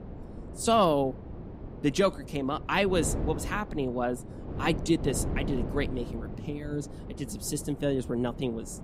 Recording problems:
wind noise on the microphone; occasional gusts; 15 dB below the speech

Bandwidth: 15.5 kHz